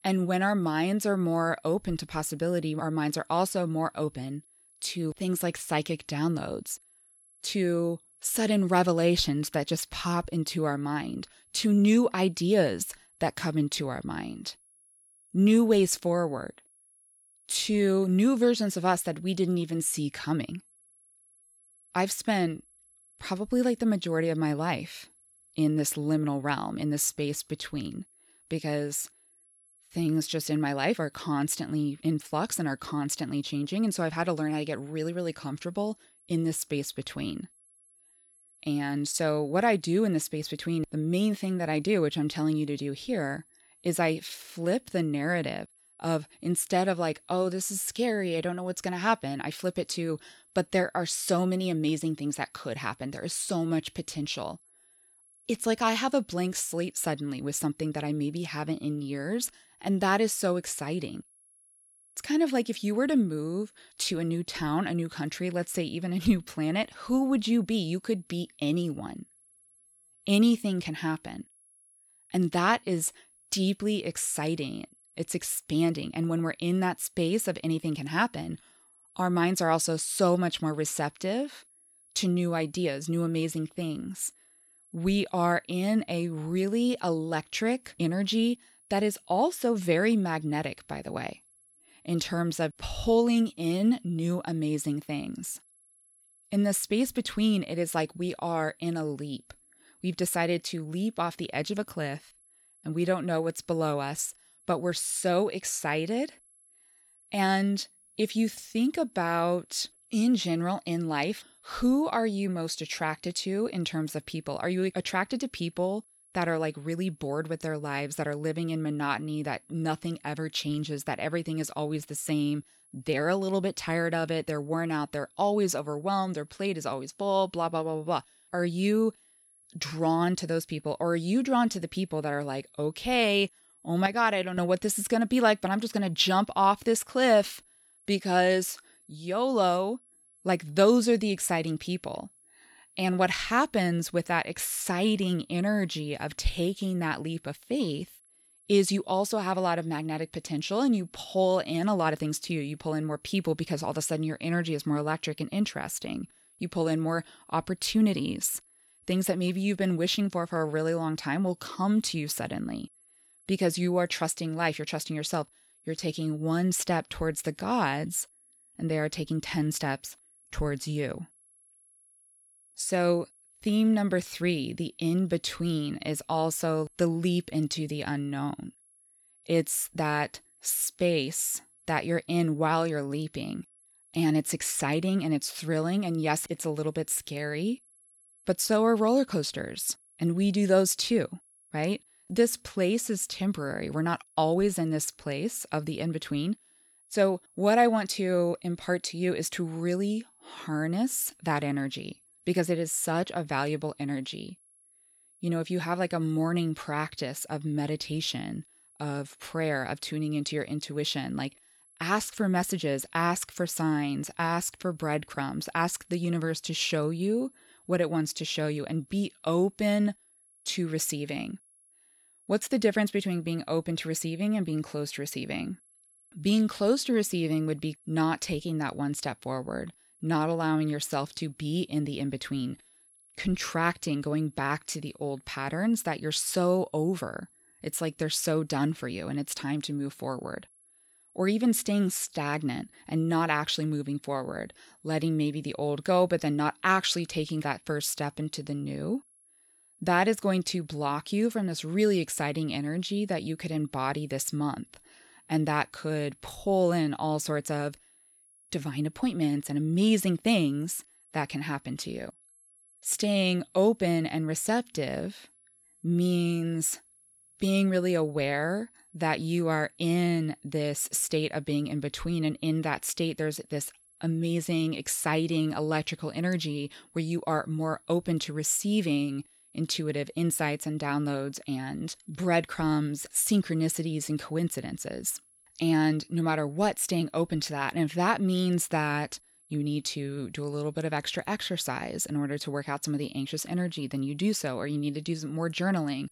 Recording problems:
high-pitched whine; faint; throughout; 11 kHz, 30 dB below the speech

